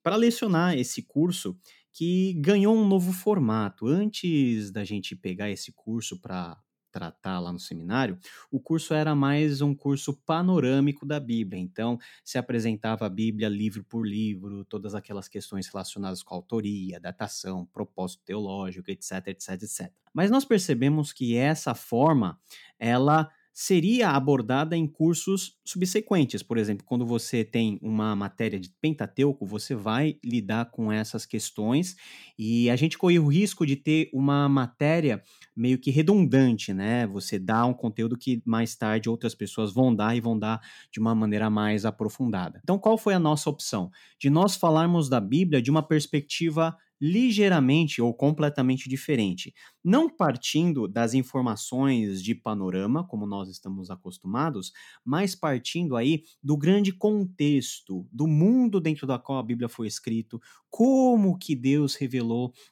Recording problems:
none

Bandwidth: 17 kHz